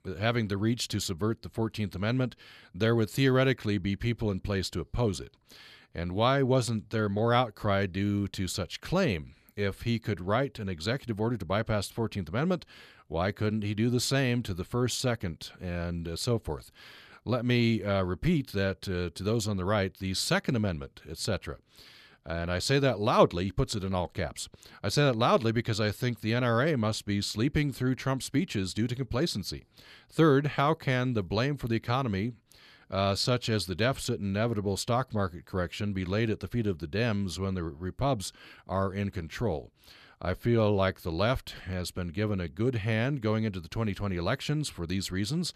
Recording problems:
none

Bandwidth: 14.5 kHz